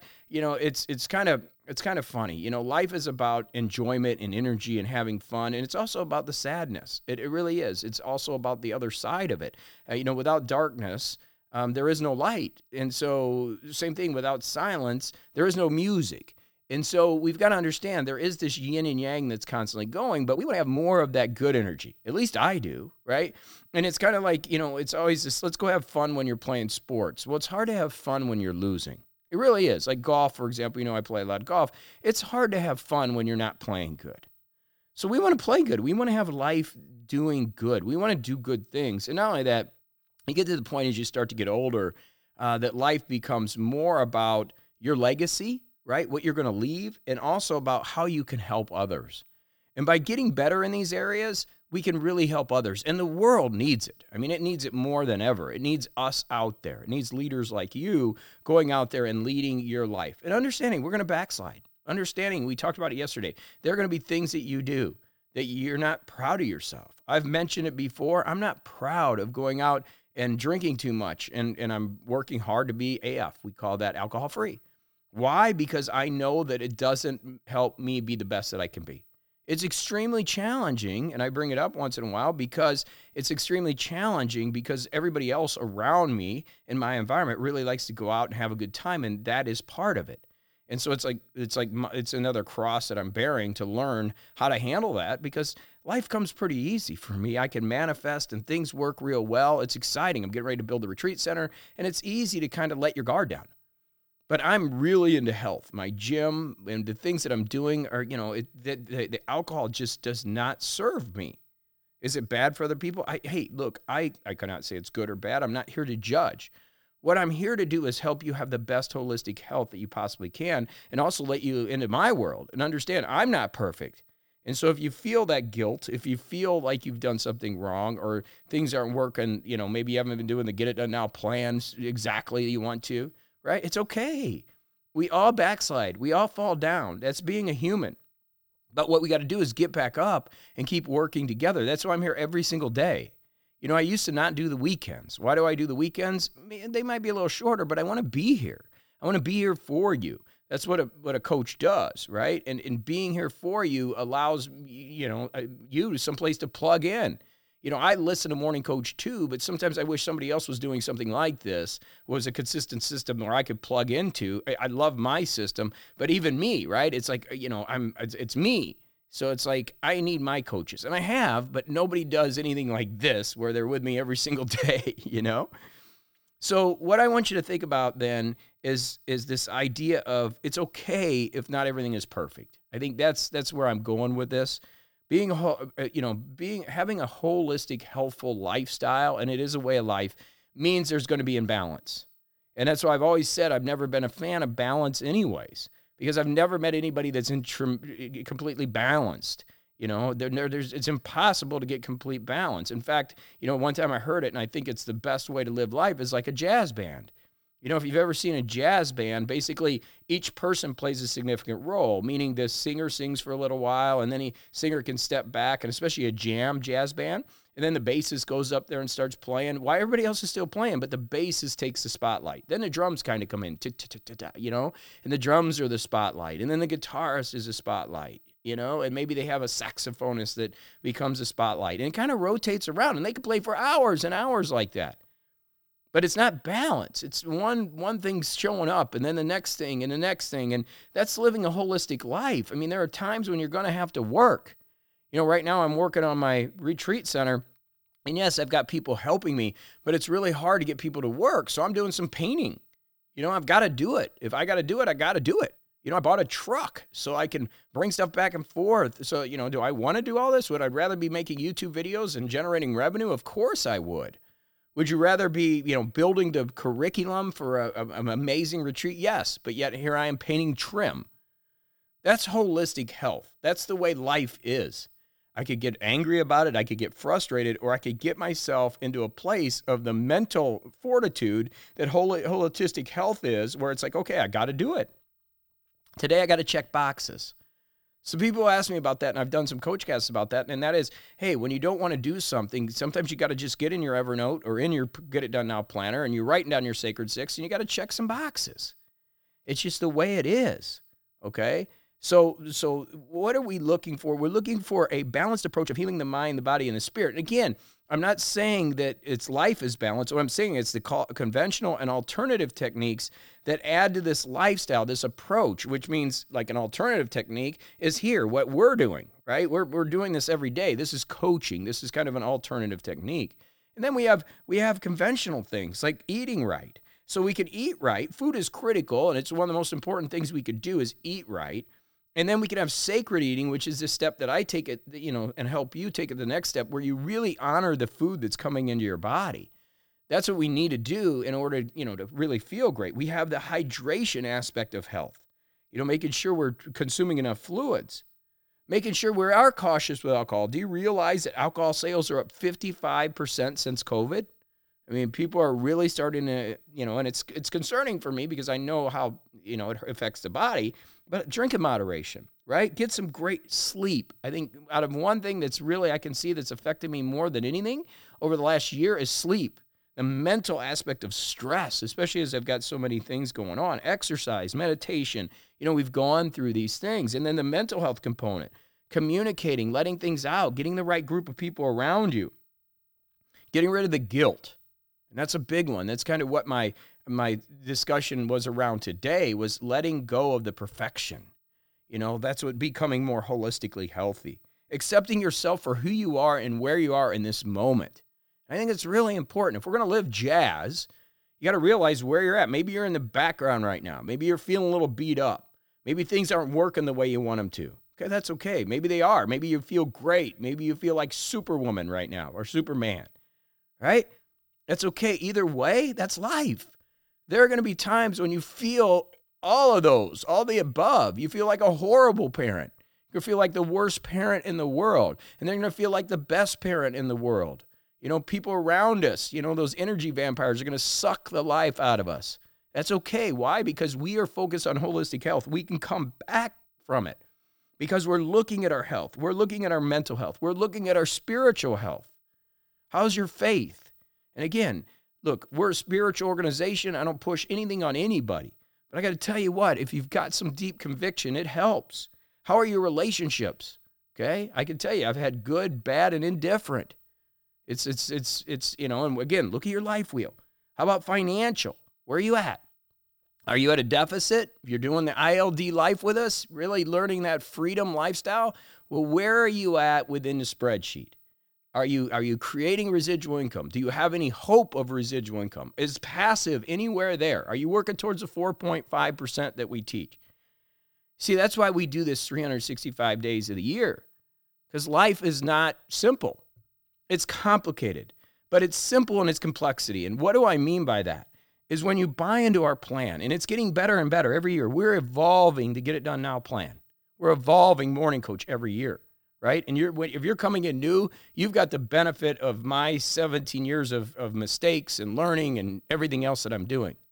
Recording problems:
uneven, jittery; strongly; from 20 s to 8:23

